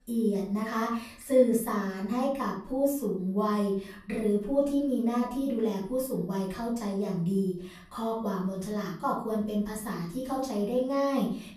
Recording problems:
off-mic speech; far
room echo; noticeable; dies away in 0.5 s

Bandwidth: 14.5 kHz